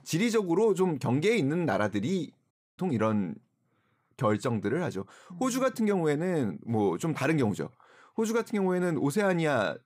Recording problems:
audio cutting out; at 2.5 s

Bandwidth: 15.5 kHz